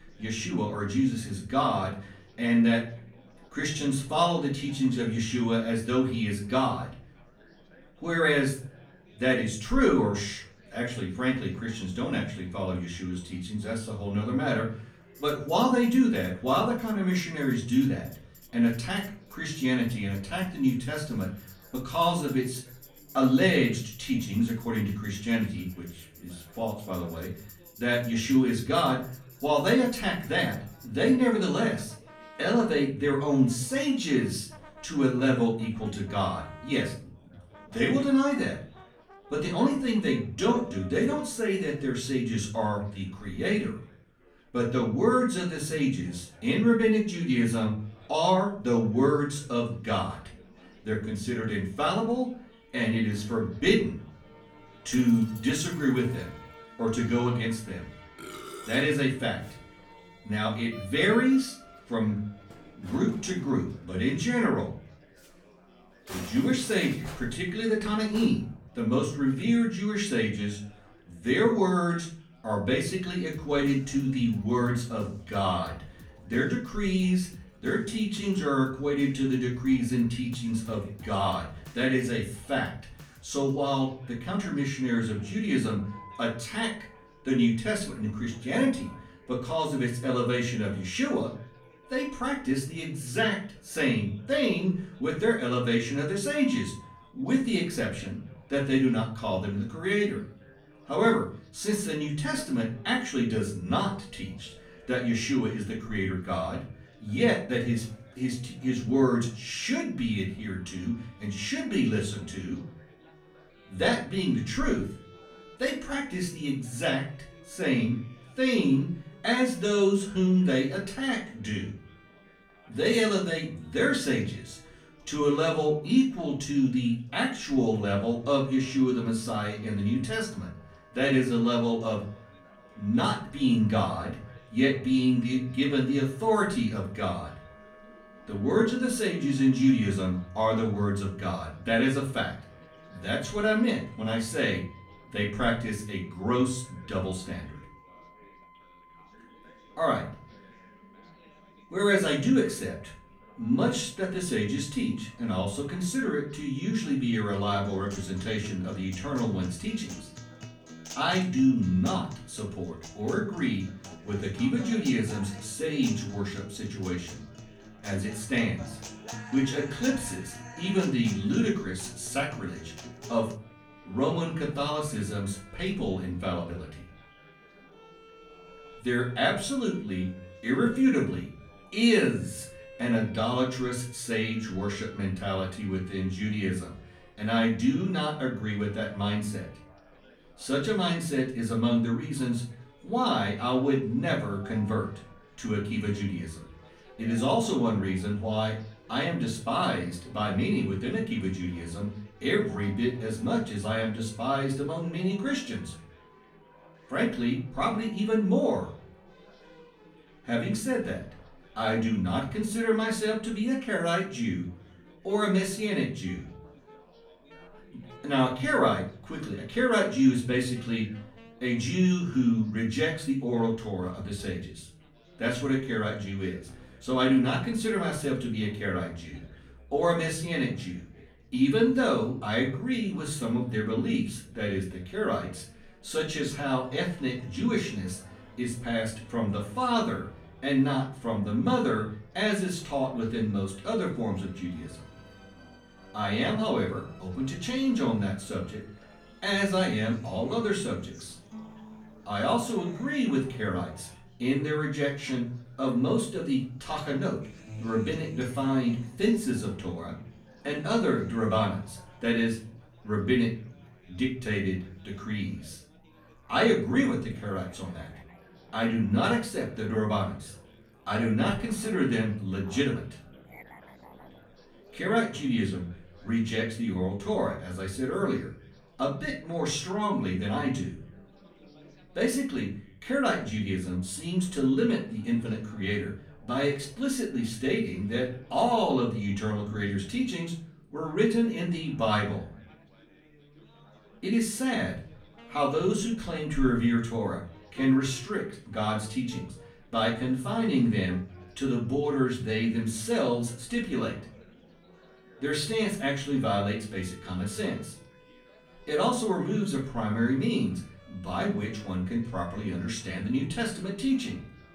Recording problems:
off-mic speech; far
room echo; slight; dies away in 0.4 s
background music; faint; throughout; 25 dB below the speech
chatter from many people; faint; throughout; 30 dB below the speech

